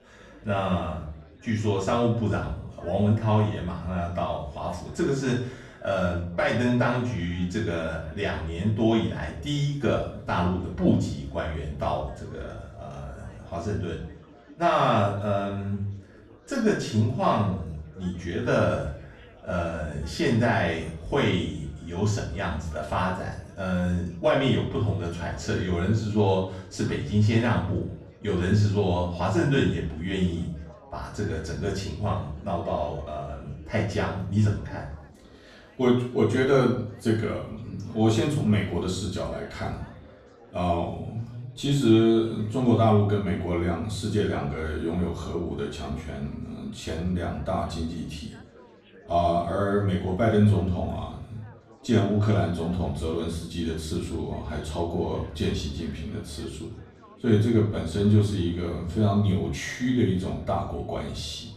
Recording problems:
off-mic speech; far
room echo; noticeable; dies away in 0.5 s
chatter from many people; faint; throughout; 25 dB below the speech

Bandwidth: 13.5 kHz